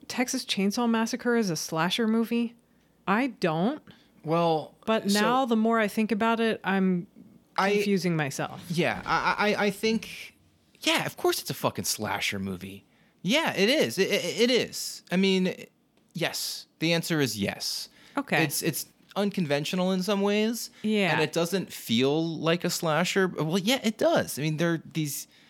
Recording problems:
none

